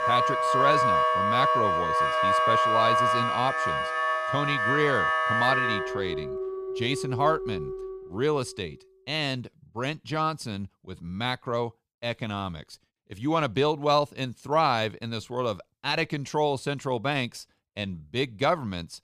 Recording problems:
background music; very loud; until 8 s; 4 dB above the speech

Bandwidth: 14.5 kHz